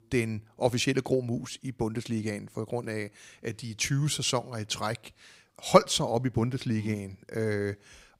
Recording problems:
none

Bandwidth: 15.5 kHz